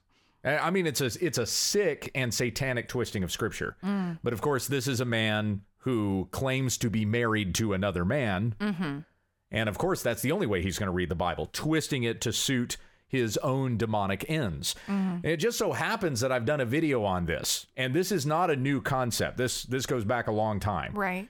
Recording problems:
none

